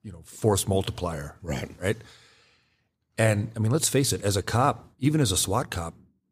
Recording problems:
none

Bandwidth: 15 kHz